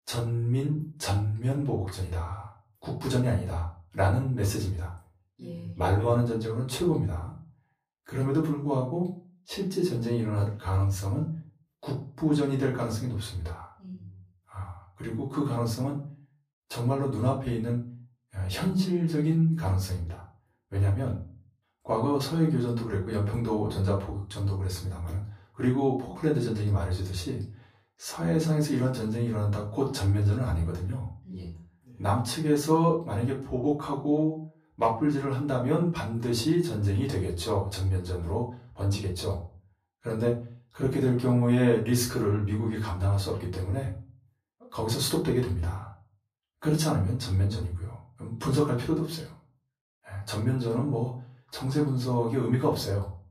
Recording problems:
off-mic speech; far
room echo; slight; dies away in 0.3 s

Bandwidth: 15 kHz